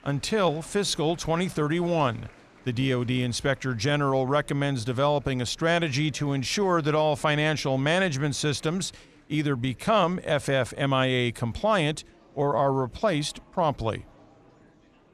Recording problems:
murmuring crowd; faint; throughout; 25 dB below the speech

